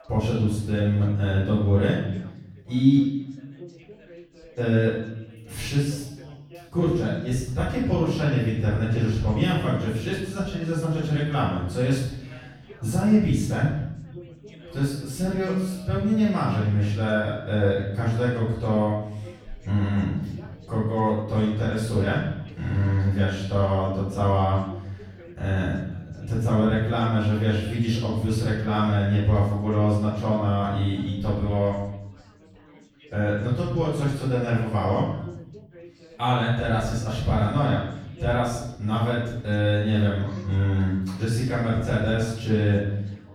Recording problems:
room echo; strong; dies away in 0.9 s
off-mic speech; far
background chatter; faint; throughout; 4 voices, 25 dB below the speech

